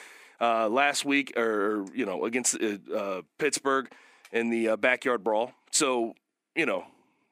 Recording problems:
thin; very slightly; fading below 250 Hz

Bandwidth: 15 kHz